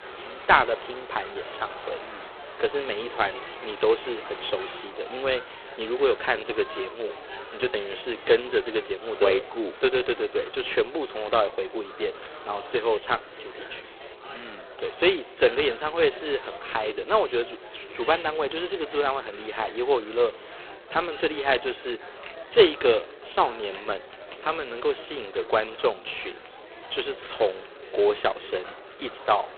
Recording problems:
phone-call audio; poor line; nothing above 4 kHz
murmuring crowd; noticeable; throughout; 15 dB below the speech
household noises; faint; throughout; 25 dB below the speech

